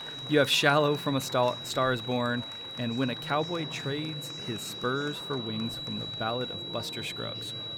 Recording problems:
high-pitched whine; loud; throughout; 4 kHz, 7 dB below the speech
murmuring crowd; noticeable; throughout; 15 dB below the speech

